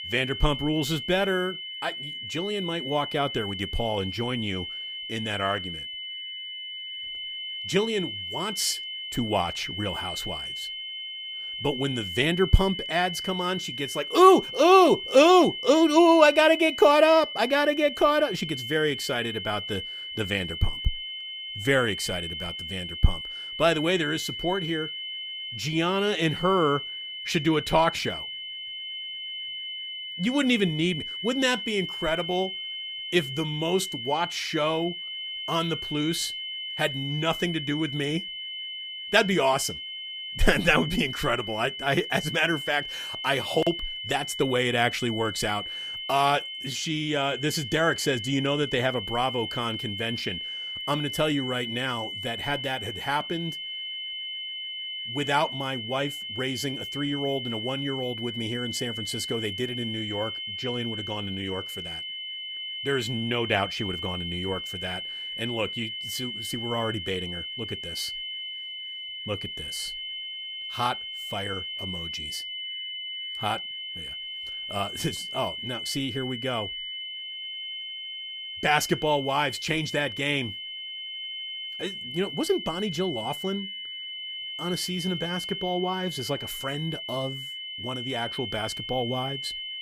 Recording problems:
high-pitched whine; loud; throughout; 3 kHz, 6 dB below the speech

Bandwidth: 15 kHz